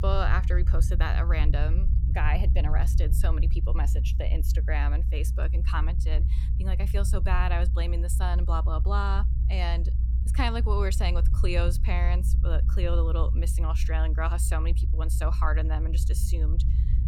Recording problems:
low rumble; noticeable; throughout; 10 dB below the speech

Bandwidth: 17 kHz